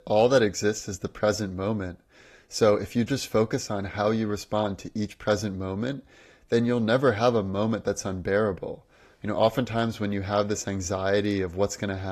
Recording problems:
garbled, watery; slightly; nothing above 14 kHz
abrupt cut into speech; at the end

